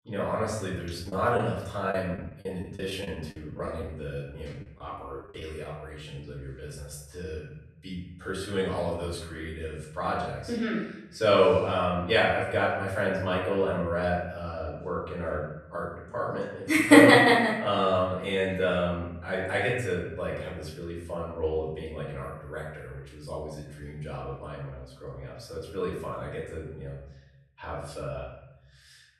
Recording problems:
off-mic speech; far
room echo; noticeable; dies away in 0.8 s
choppy; very; from 1 to 5.5 s; 12% of the speech affected

